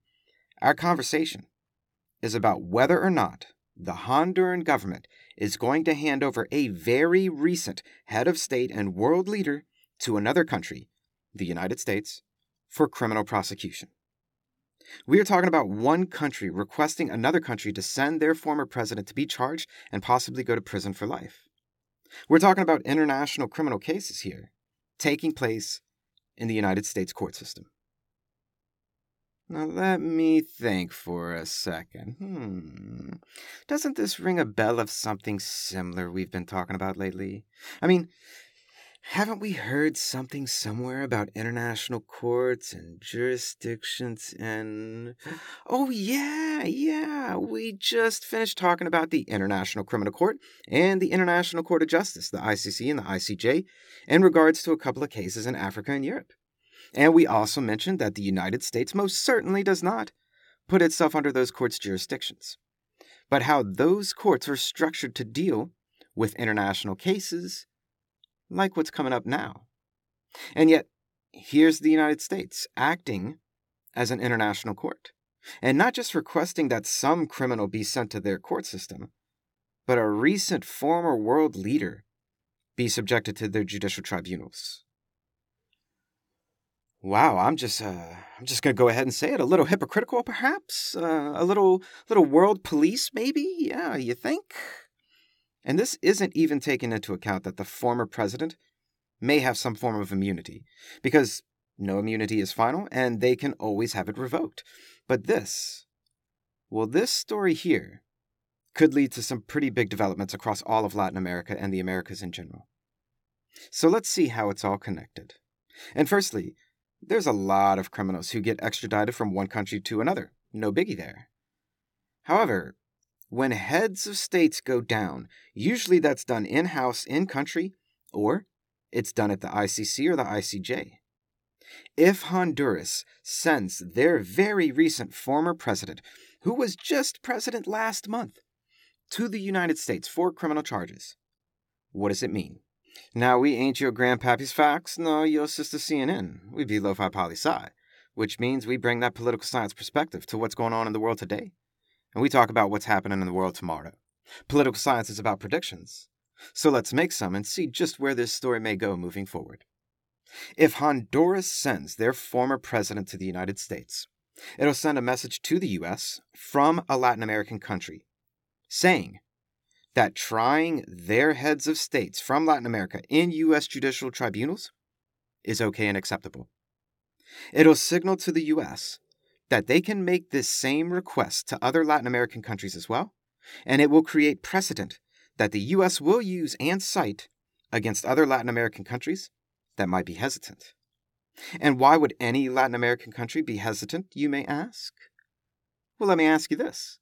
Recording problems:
none

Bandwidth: 17.5 kHz